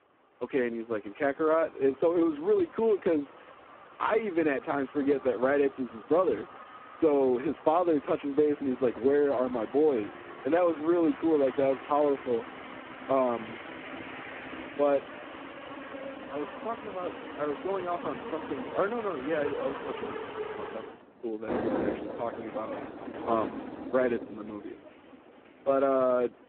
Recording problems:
phone-call audio; poor line
traffic noise; noticeable; throughout; 10 dB below the speech

